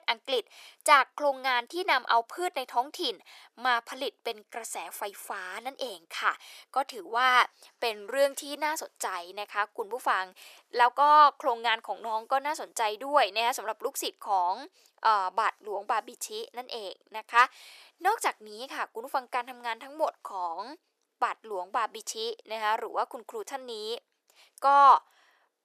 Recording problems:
thin; very; fading below 450 Hz

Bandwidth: 14.5 kHz